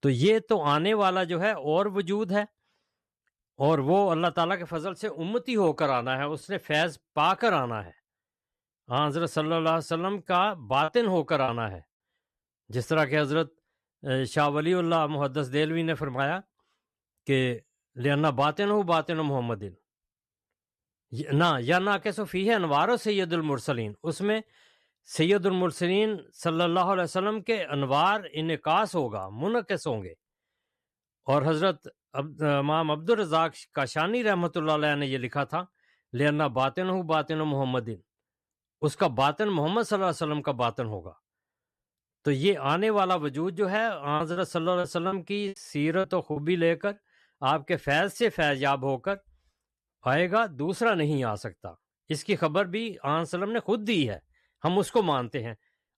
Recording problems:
choppy; very; at 11 s and from 44 to 46 s; 10% of the speech affected

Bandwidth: 13.5 kHz